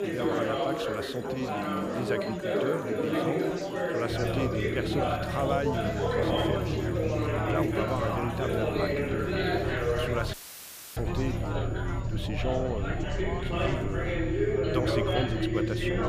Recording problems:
chatter from many people; very loud; throughout; 5 dB above the speech
low rumble; noticeable; from 4 s on; 10 dB below the speech
high-pitched whine; faint; throughout; 7 kHz, 25 dB below the speech
rain or running water; faint; throughout; 20 dB below the speech
audio cutting out; filled with static; at 10 s for 0.5 s

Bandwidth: 15 kHz